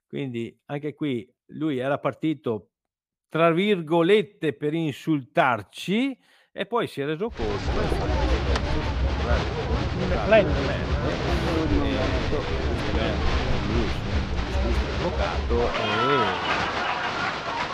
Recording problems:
crowd noise; very loud; from 7.5 s on; 2 dB above the speech

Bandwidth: 15 kHz